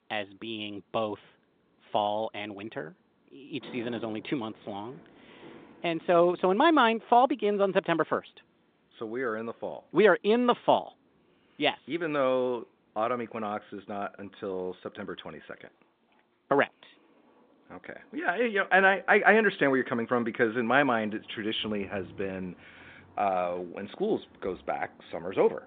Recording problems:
phone-call audio; nothing above 3.5 kHz
traffic noise; faint; throughout; 30 dB below the speech

